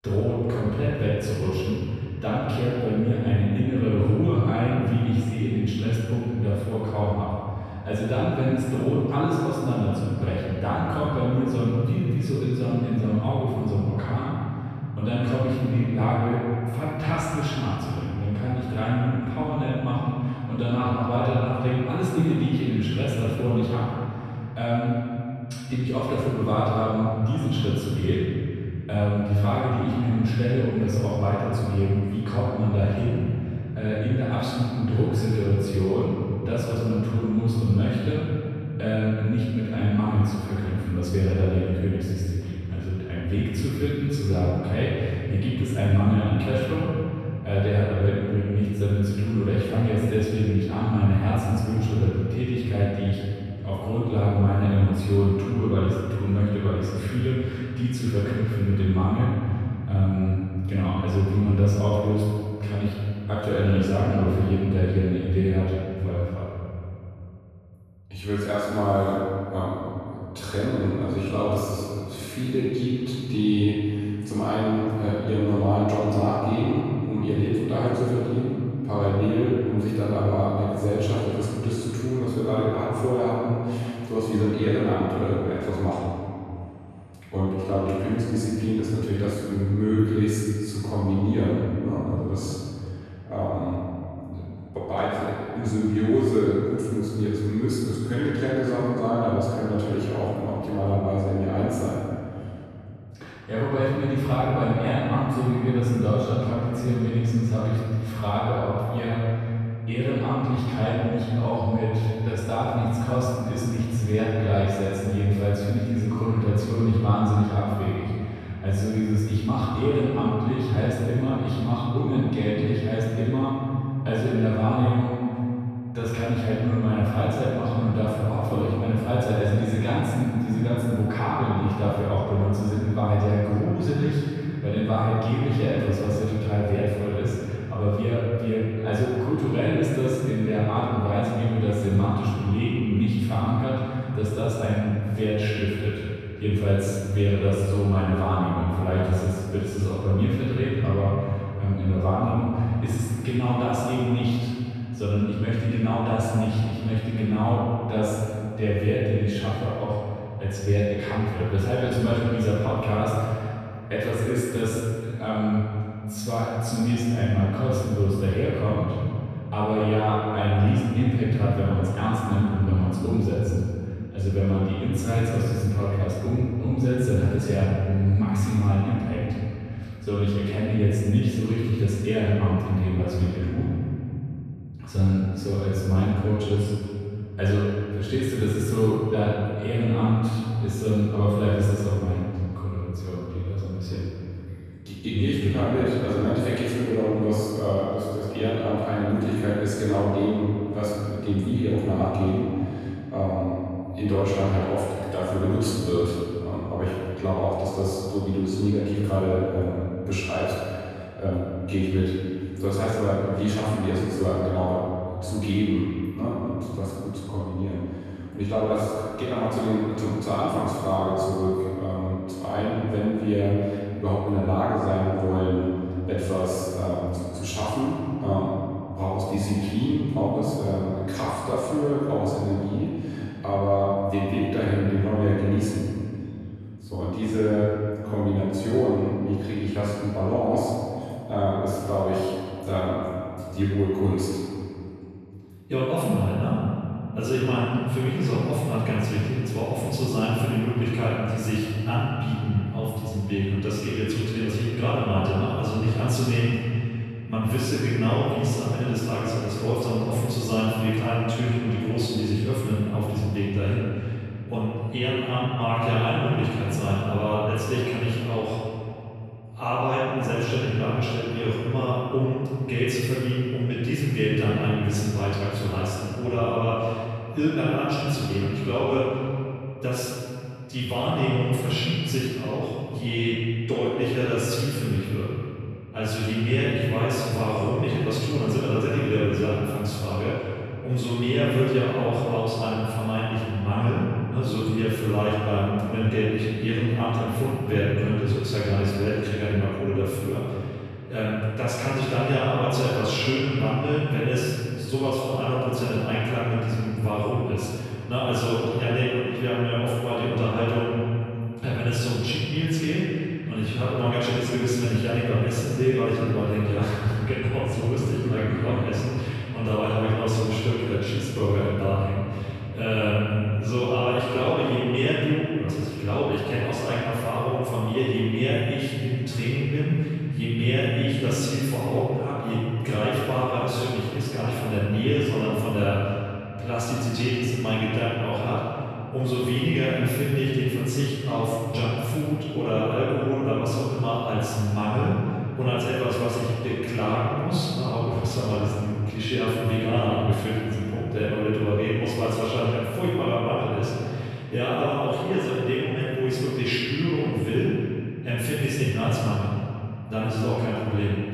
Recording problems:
room echo; strong; dies away in 2.7 s
off-mic speech; far

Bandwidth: 13.5 kHz